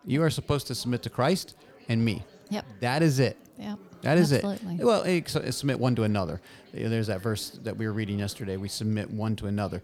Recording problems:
chatter from many people; faint; throughout; 25 dB below the speech

